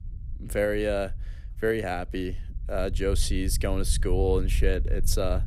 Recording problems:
low rumble; faint; throughout; 20 dB below the speech

